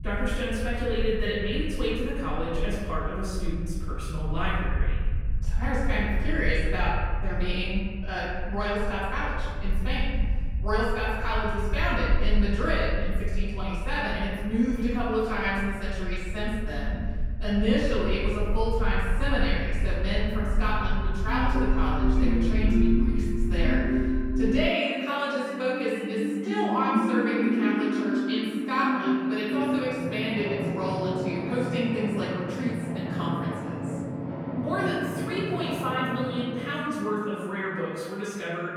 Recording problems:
room echo; strong; dies away in 1.5 s
off-mic speech; far
background music; loud; from 21 s on; as loud as the speech
low rumble; faint; until 25 s; 20 dB below the speech

